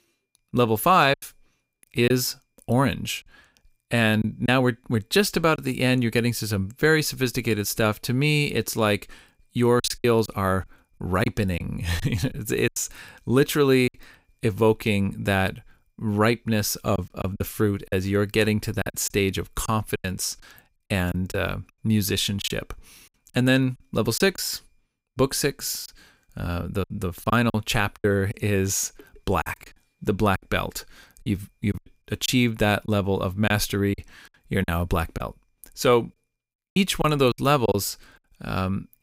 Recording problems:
choppy; very; 7% of the speech affected

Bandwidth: 15.5 kHz